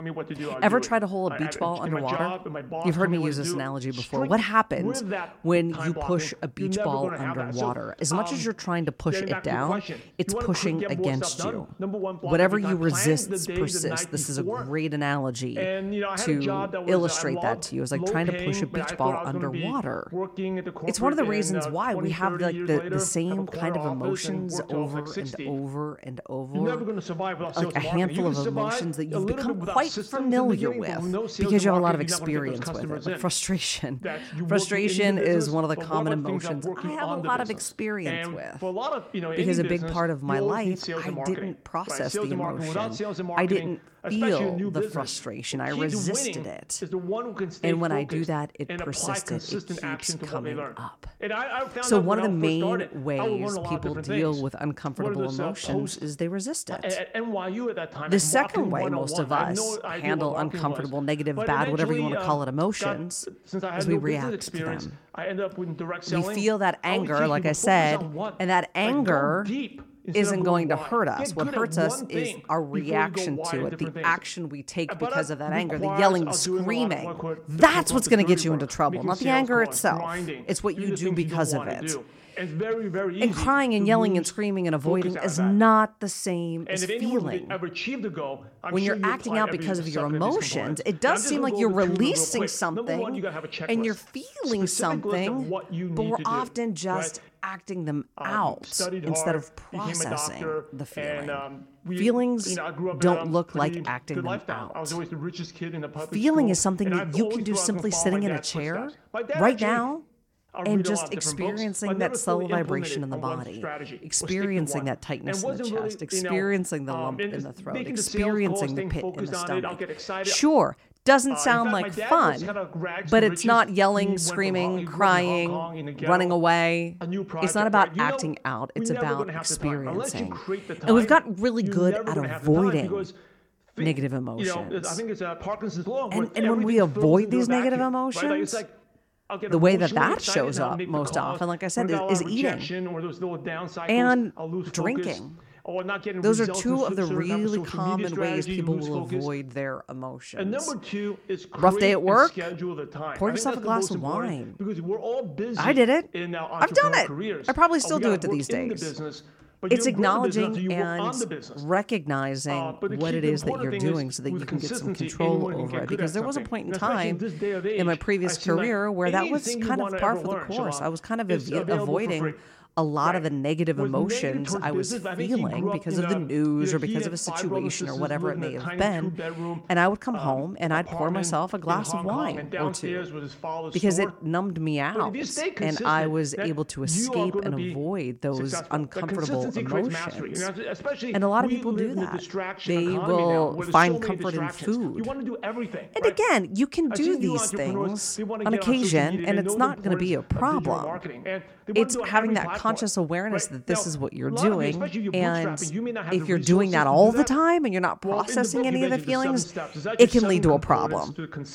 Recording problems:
voice in the background; loud; throughout; 6 dB below the speech

